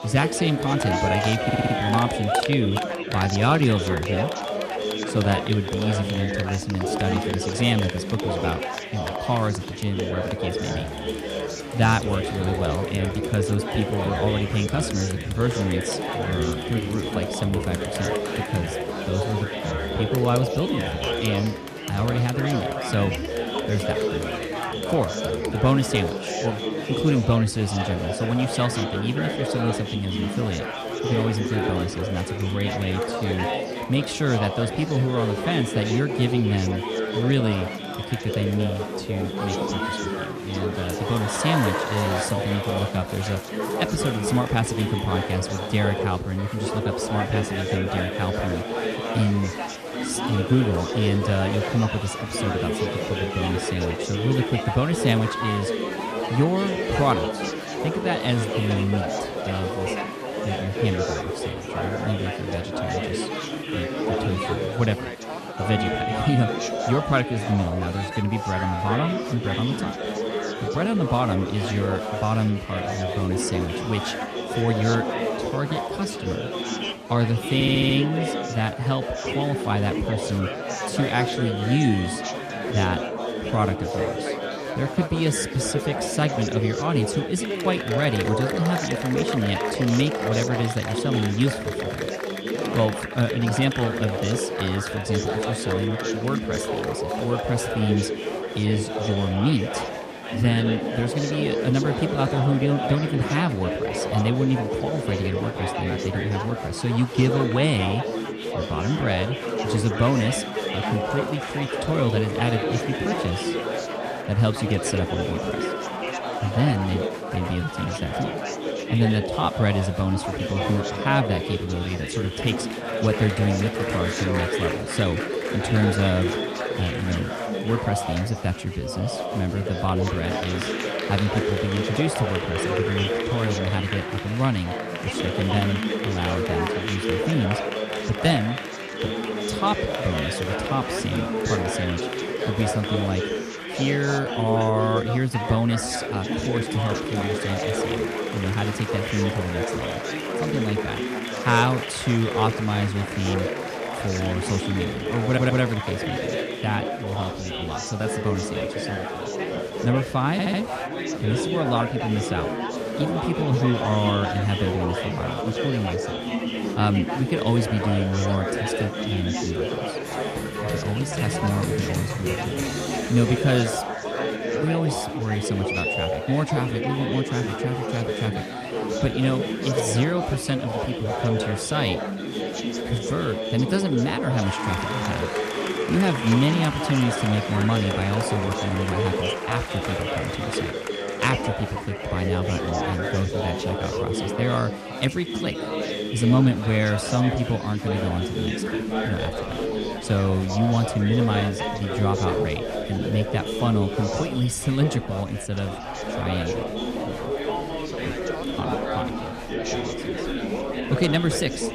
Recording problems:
chatter from many people; loud; throughout; 2 dB below the speech
audio stuttering; 4 times, first at 1.5 s

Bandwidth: 14 kHz